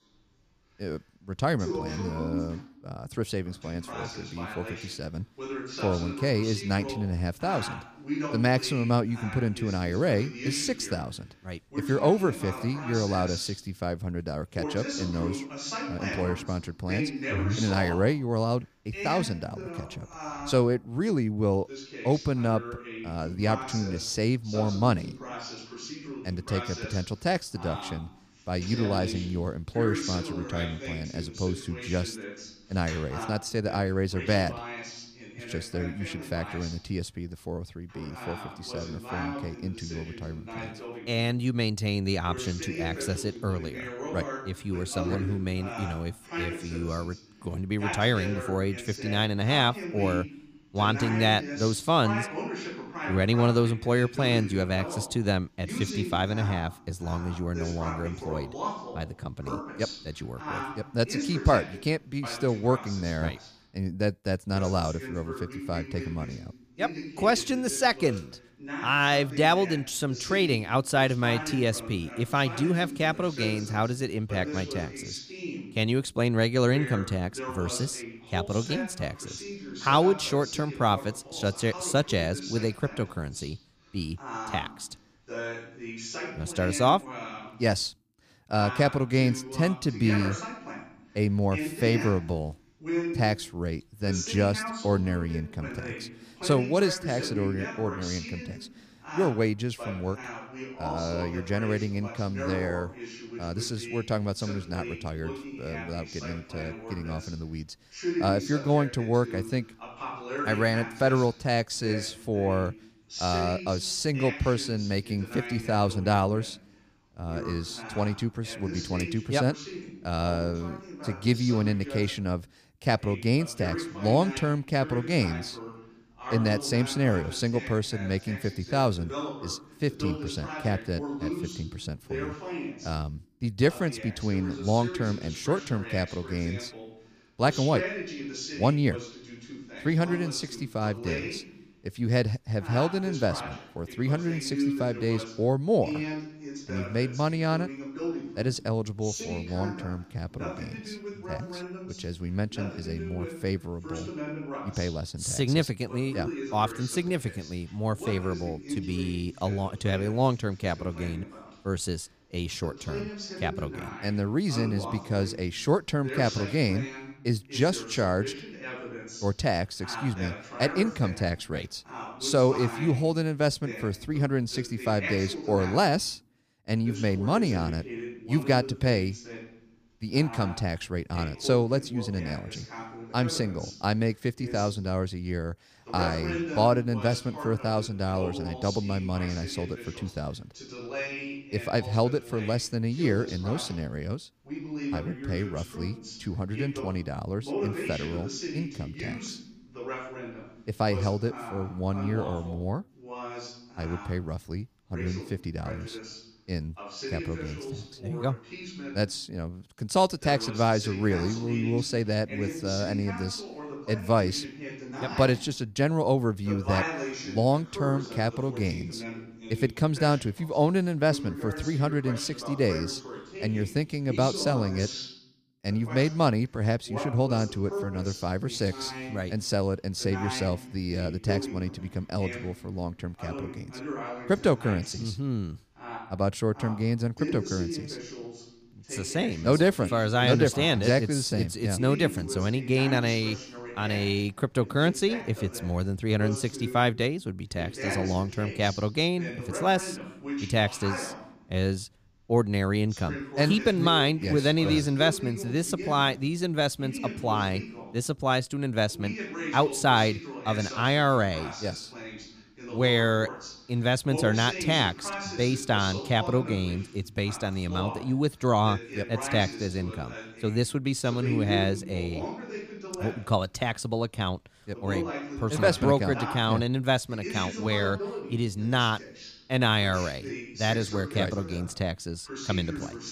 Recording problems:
voice in the background; loud; throughout; 9 dB below the speech

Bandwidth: 15 kHz